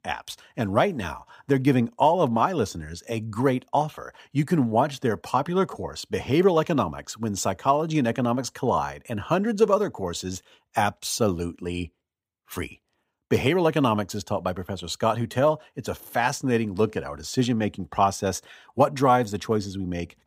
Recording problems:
none

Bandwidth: 15.5 kHz